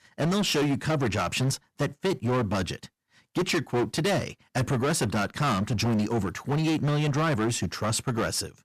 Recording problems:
distortion; heavy; 19% of the sound clipped

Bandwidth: 14.5 kHz